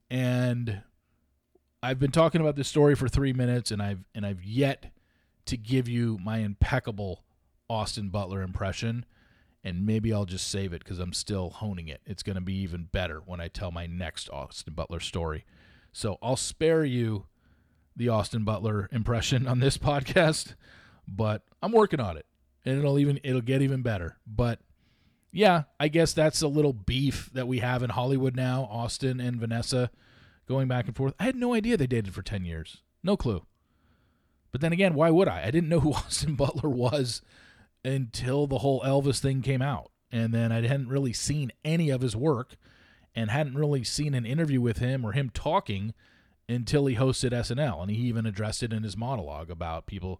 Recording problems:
none

